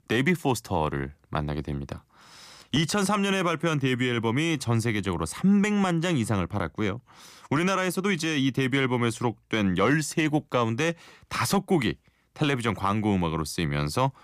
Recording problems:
none

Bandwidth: 15 kHz